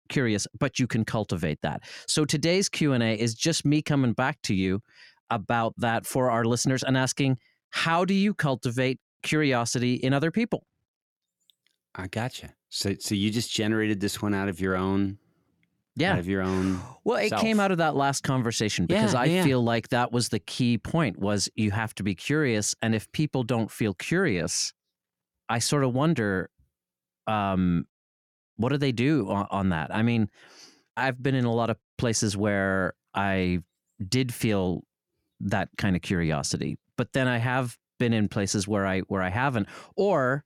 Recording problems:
none

